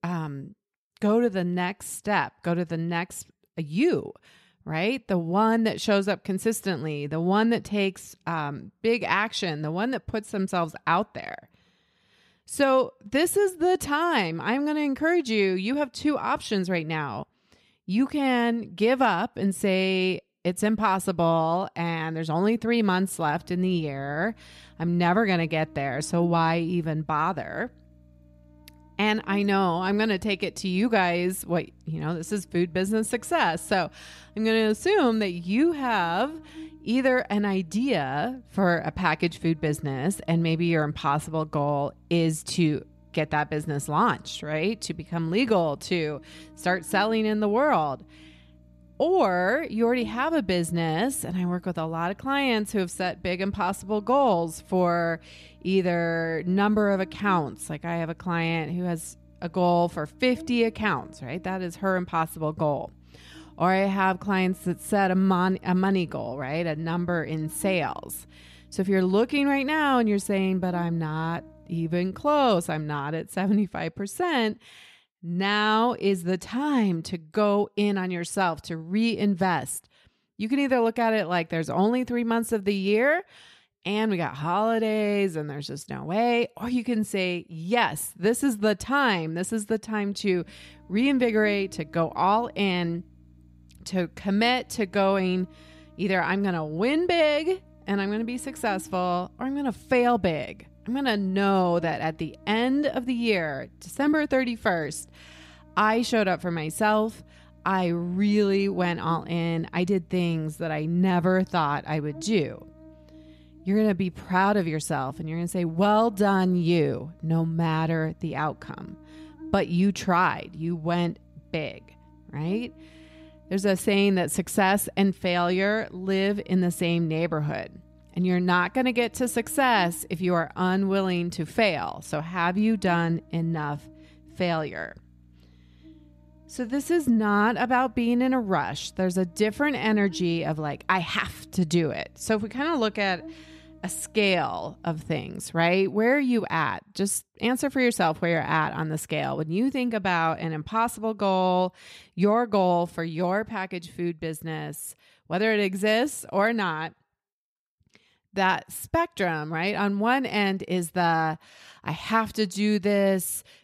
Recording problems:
electrical hum; faint; from 23 s to 1:13 and from 1:30 to 2:25; 60 Hz, 30 dB below the speech

